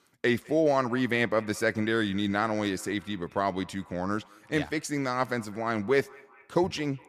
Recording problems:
echo of what is said; faint; throughout; 210 ms later, 25 dB below the speech

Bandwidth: 15 kHz